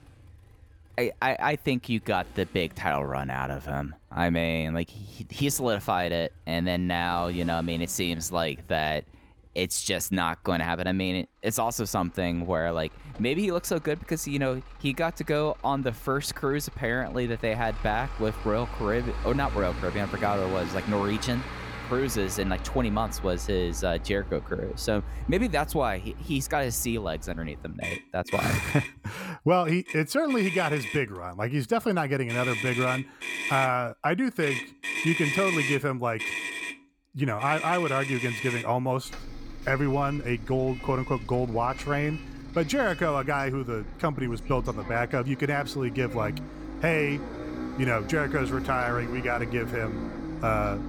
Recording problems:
traffic noise; loud; throughout; 7 dB below the speech

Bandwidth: 17.5 kHz